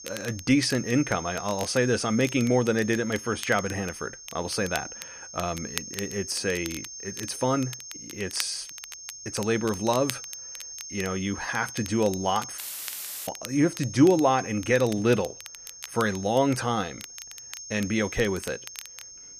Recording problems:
high-pitched whine; noticeable; throughout; 6.5 kHz, 10 dB below the speech
crackle, like an old record; noticeable; 15 dB below the speech
audio cutting out; filled with static; at 13 s for 0.5 s

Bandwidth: 14.5 kHz